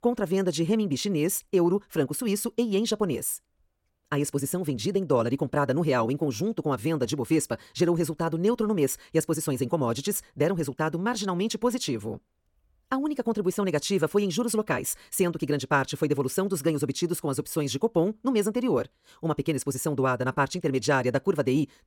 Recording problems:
wrong speed, natural pitch; too fast; 1.6 times normal speed

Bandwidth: 17.5 kHz